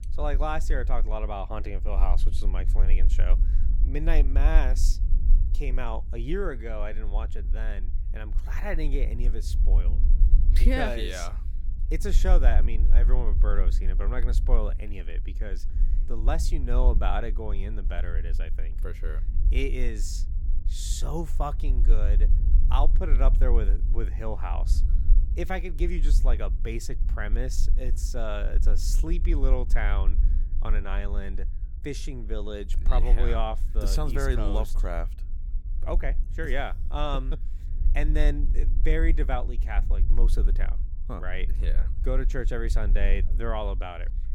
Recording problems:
low rumble; noticeable; throughout; 15 dB below the speech

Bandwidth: 17.5 kHz